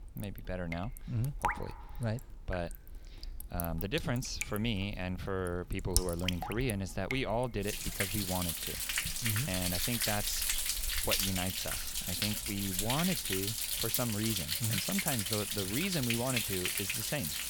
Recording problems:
rain or running water; very loud; throughout; 3 dB above the speech

